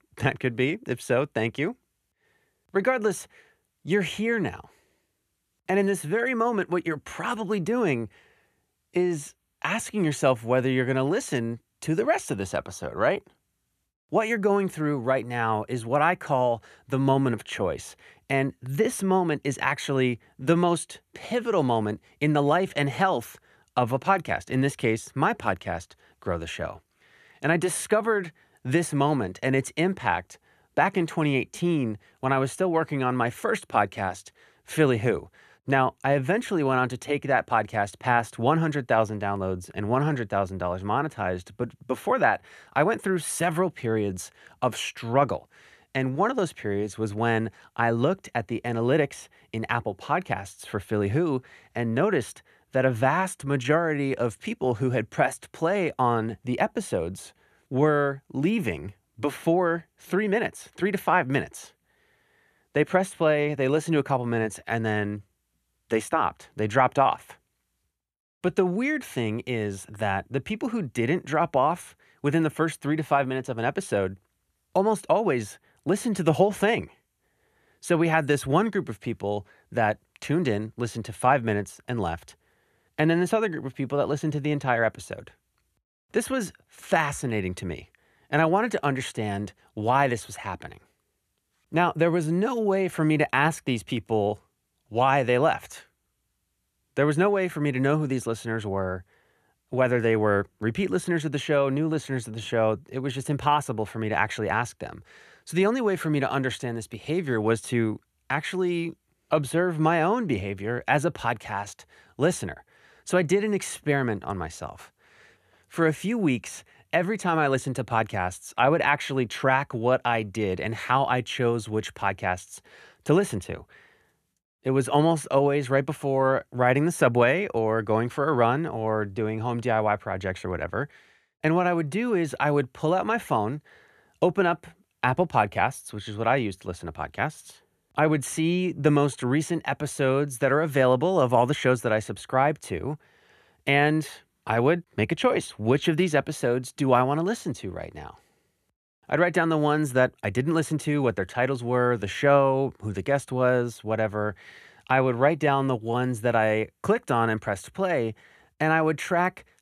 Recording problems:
none

